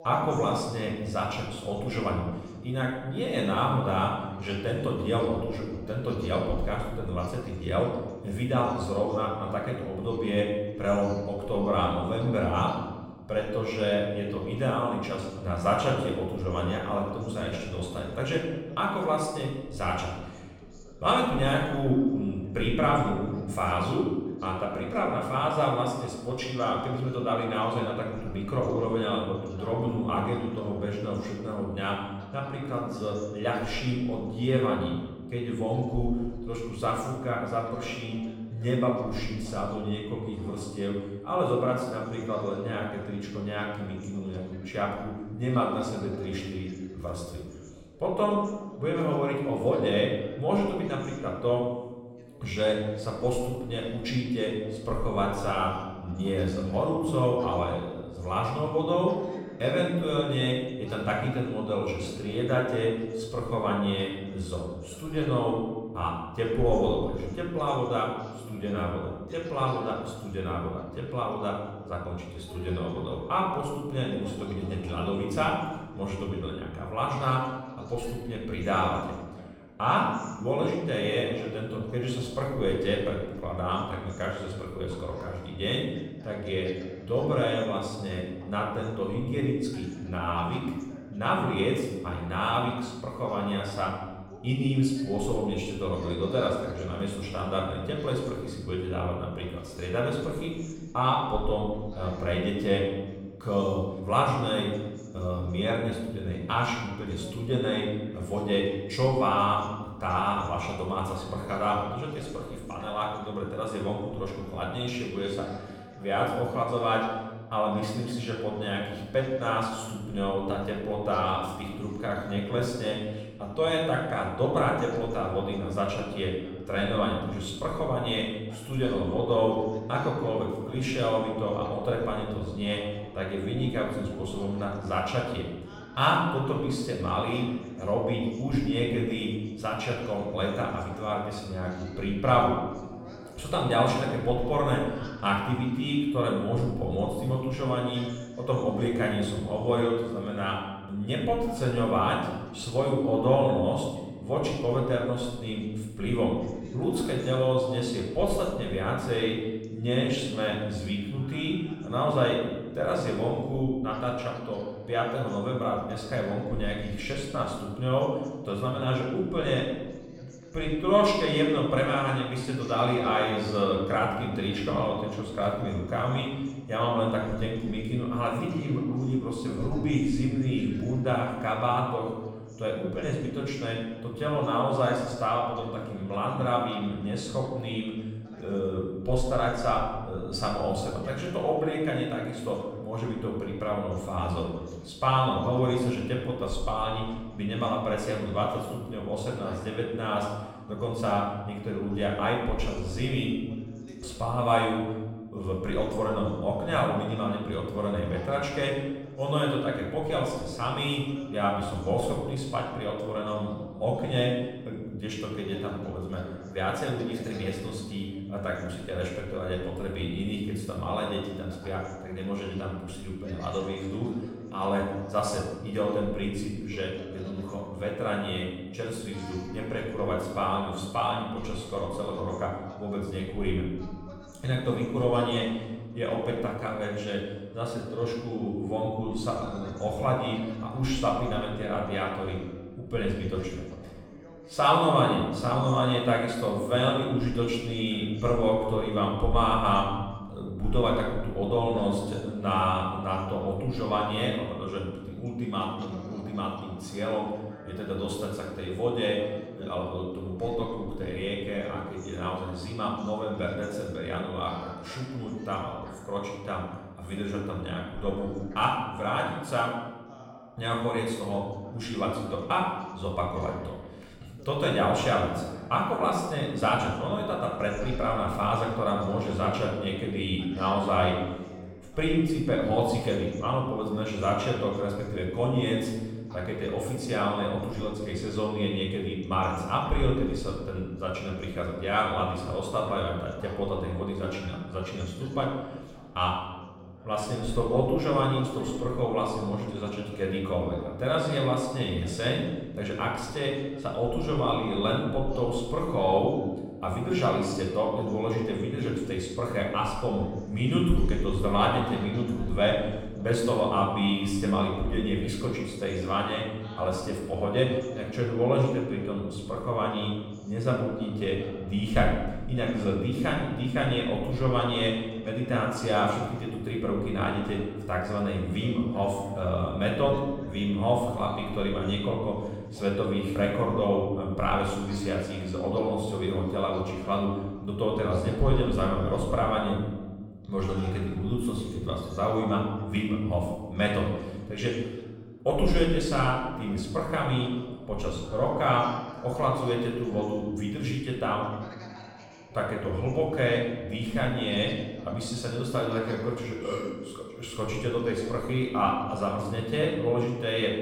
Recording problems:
off-mic speech; far
room echo; noticeable; dies away in 1.1 s
voice in the background; faint; throughout; 20 dB below the speech

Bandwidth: 17 kHz